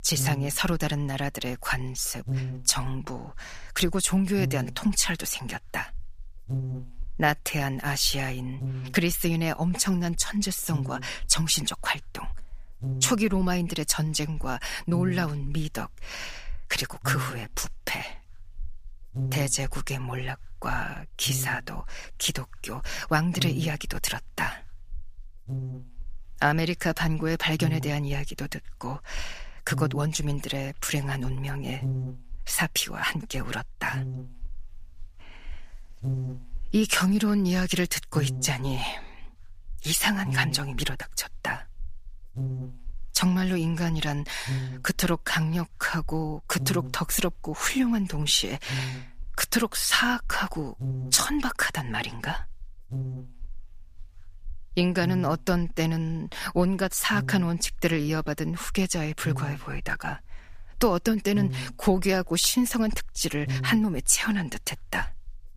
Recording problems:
electrical hum; noticeable; throughout; 50 Hz, 15 dB below the speech

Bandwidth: 15 kHz